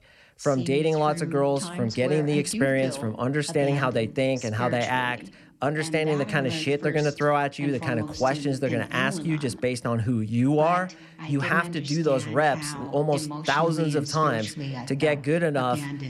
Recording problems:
voice in the background; loud; throughout; 10 dB below the speech

